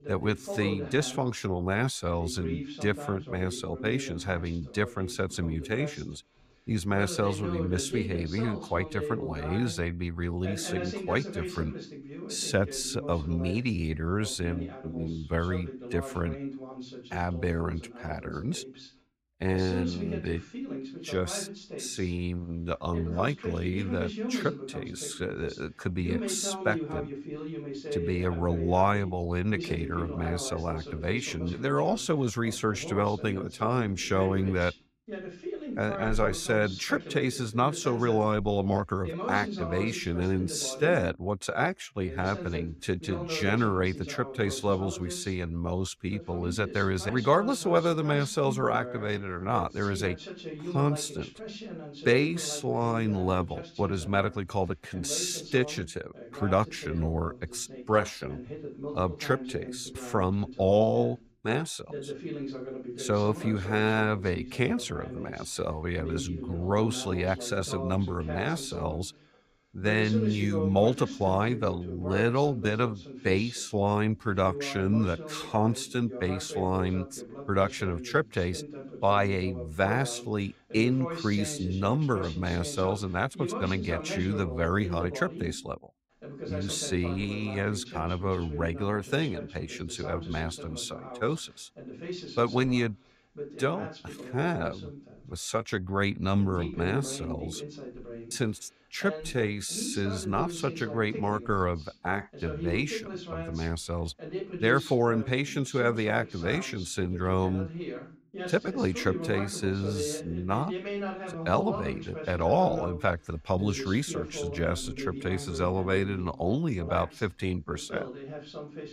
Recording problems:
voice in the background; loud; throughout; 10 dB below the speech

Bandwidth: 15.5 kHz